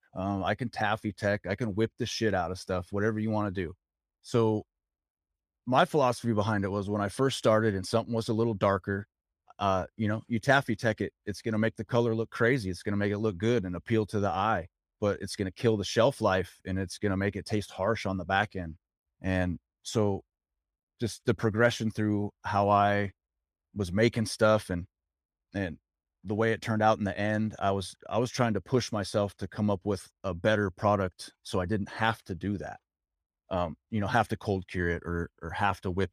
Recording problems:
none

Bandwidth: 14.5 kHz